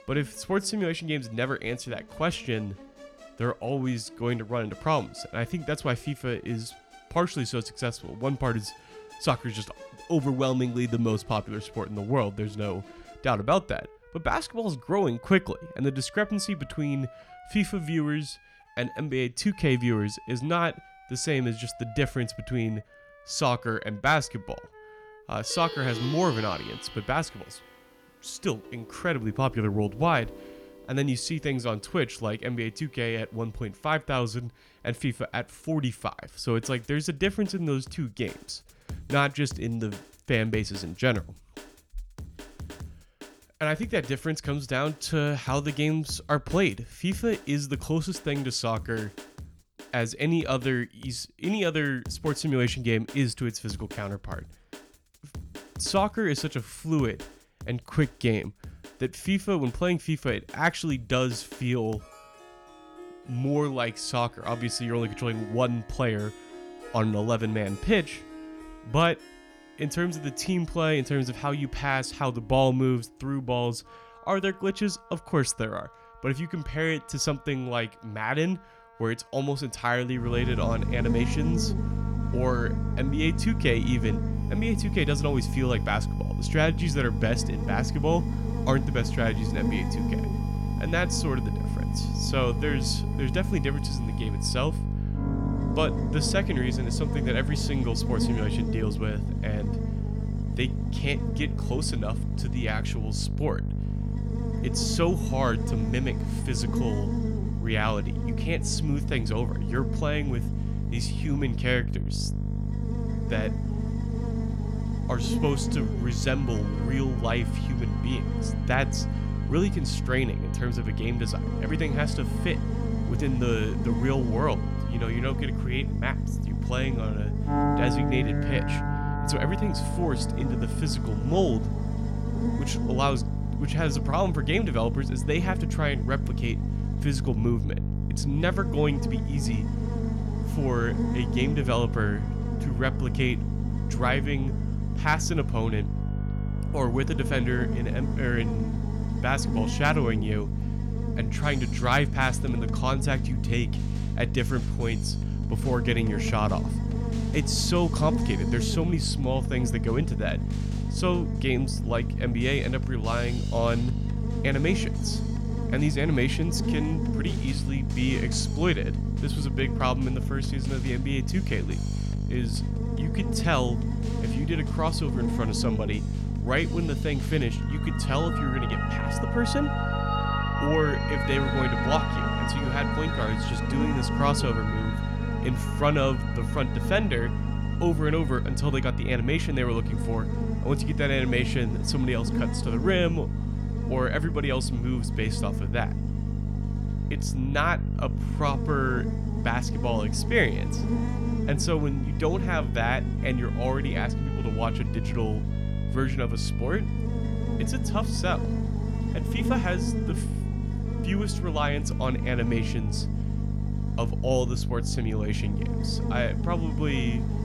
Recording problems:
electrical hum; loud; from 1:20 on; 50 Hz, 8 dB below the speech
background music; noticeable; throughout; 15 dB below the speech

